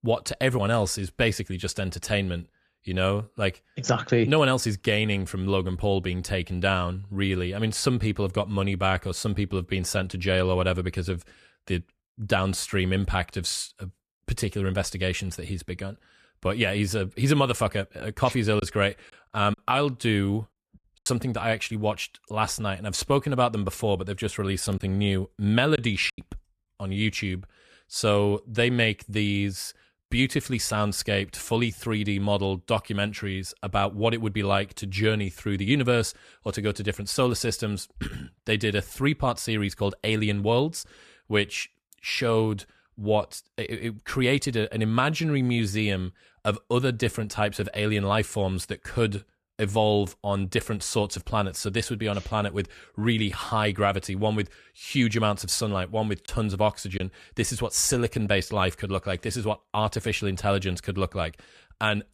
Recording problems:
choppy; occasionally; from 19 to 21 s, from 25 to 26 s and at 56 s; 5% of the speech affected

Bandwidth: 14 kHz